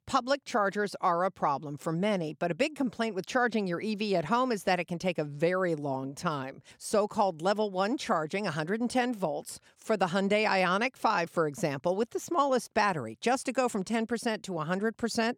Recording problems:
none

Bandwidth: 18.5 kHz